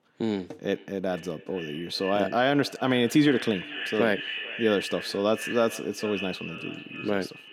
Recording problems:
echo of what is said; strong; throughout; 450 ms later, 9 dB below the speech

